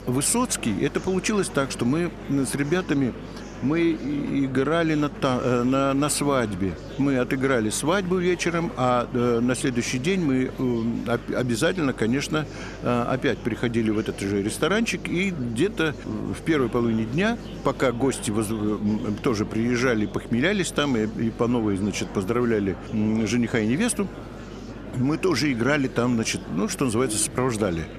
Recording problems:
murmuring crowd; noticeable; throughout; 15 dB below the speech
electrical hum; faint; throughout; 50 Hz, 25 dB below the speech

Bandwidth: 14 kHz